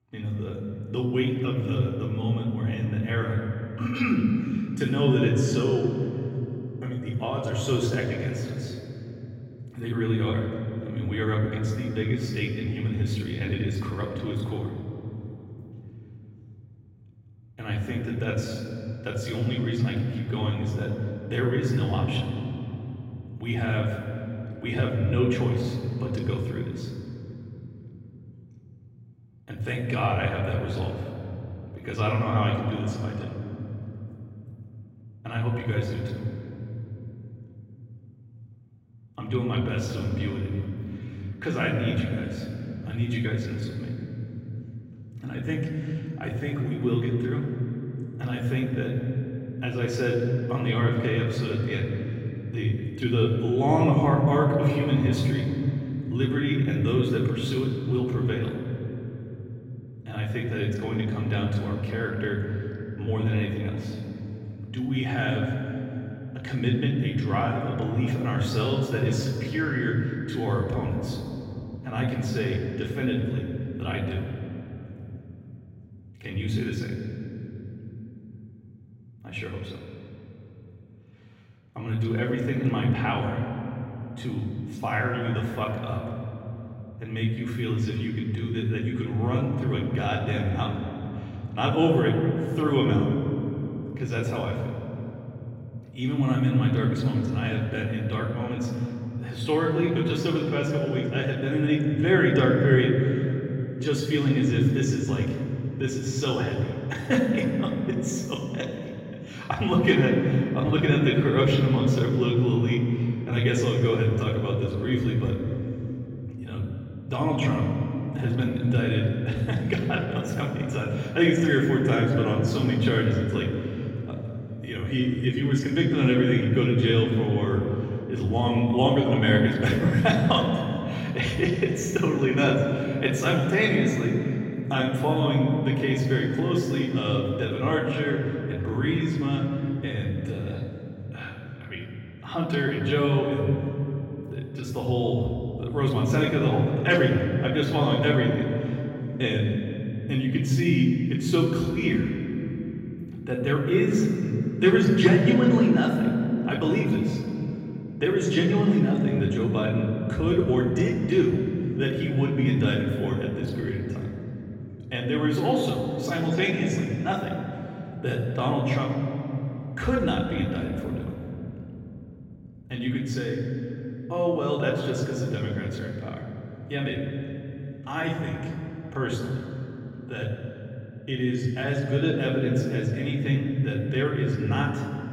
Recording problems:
off-mic speech; far
room echo; noticeable; dies away in 3 s

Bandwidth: 16 kHz